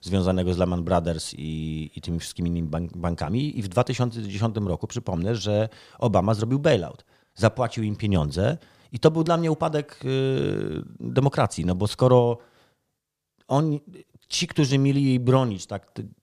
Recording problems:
none

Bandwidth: 14.5 kHz